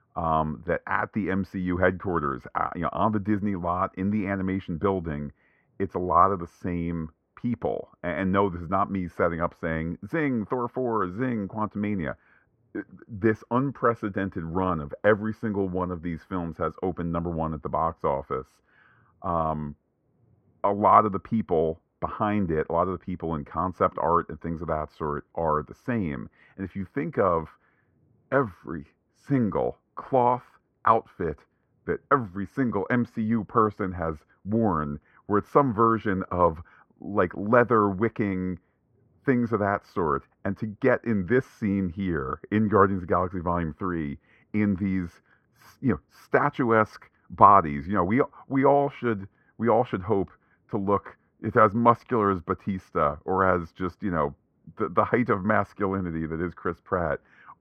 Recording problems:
muffled; very; fading above 4 kHz

